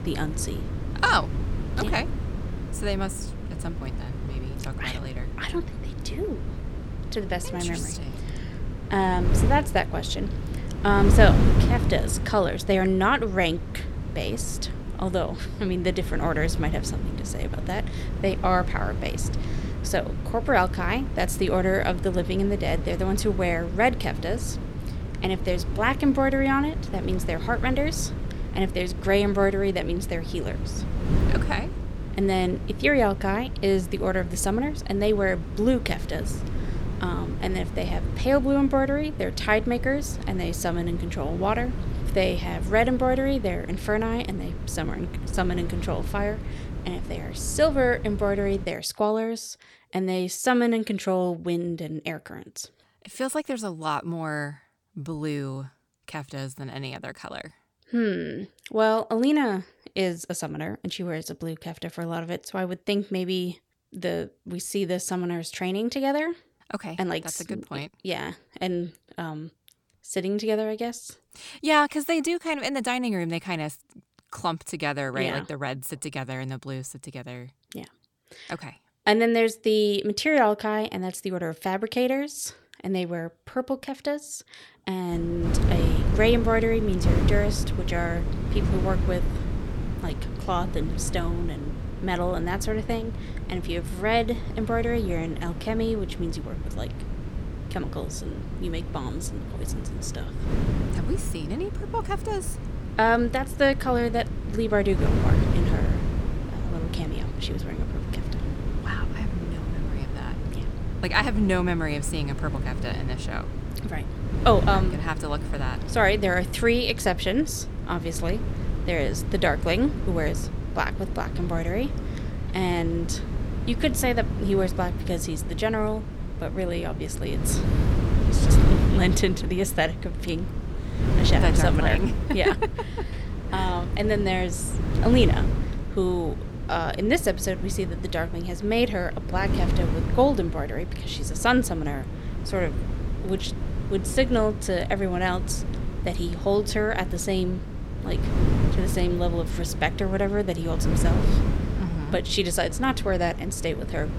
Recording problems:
wind noise on the microphone; occasional gusts; until 49 s and from 1:25 on; 10 dB below the speech

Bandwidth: 17.5 kHz